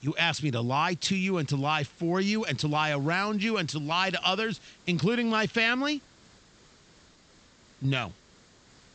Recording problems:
high frequencies cut off; noticeable; nothing above 8 kHz
hiss; faint; throughout; 30 dB below the speech

